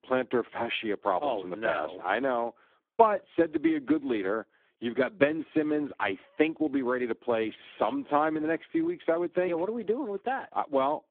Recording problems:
phone-call audio; poor line

